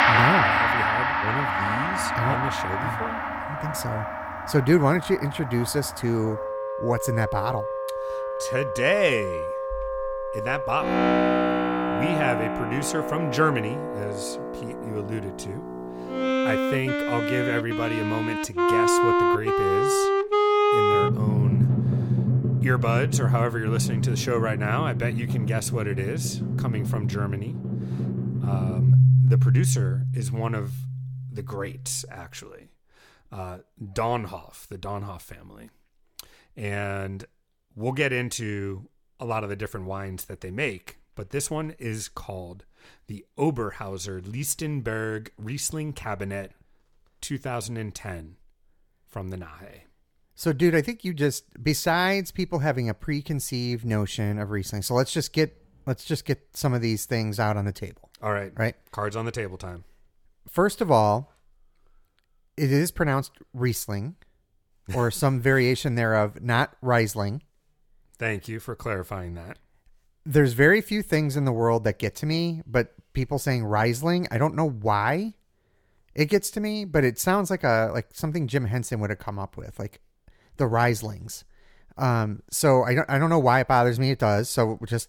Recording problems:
background music; very loud; until 32 s; 2 dB above the speech

